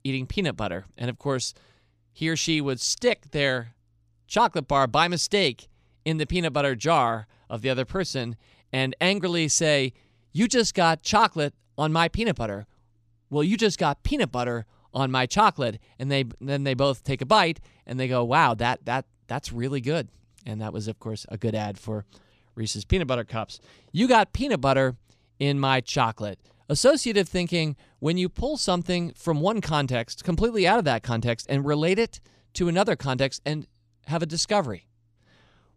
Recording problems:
none

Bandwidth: 14.5 kHz